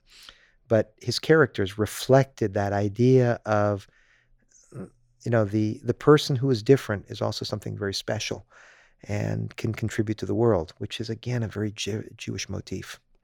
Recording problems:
none

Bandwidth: 18.5 kHz